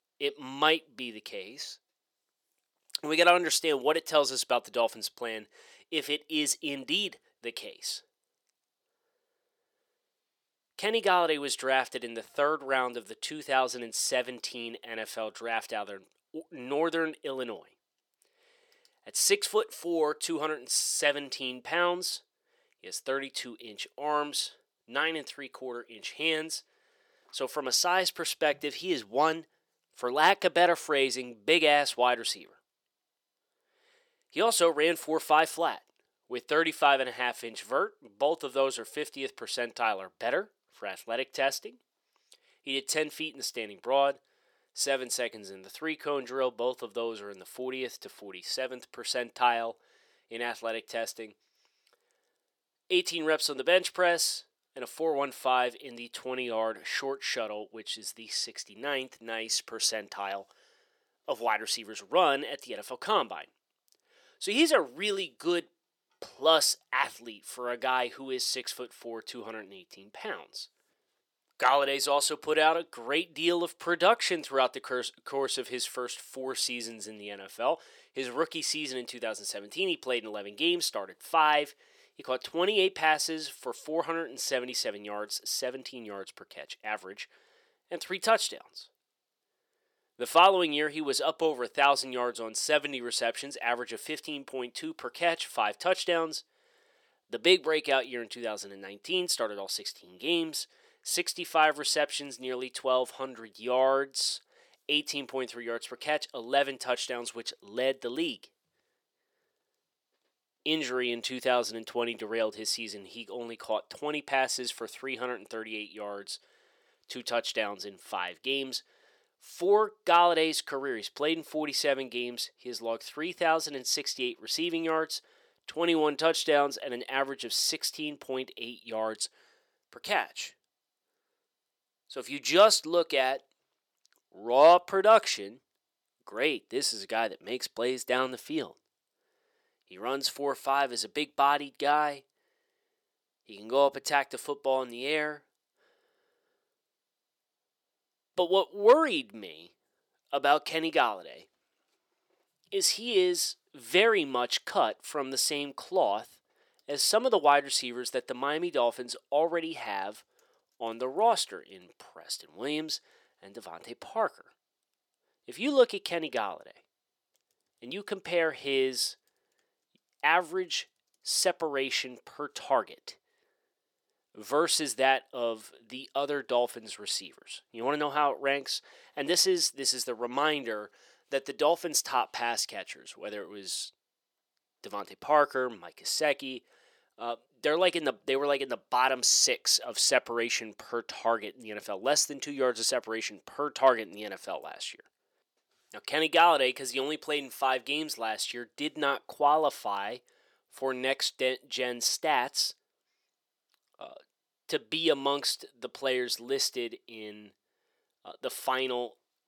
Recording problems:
thin; somewhat; fading below 450 Hz

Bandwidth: 18 kHz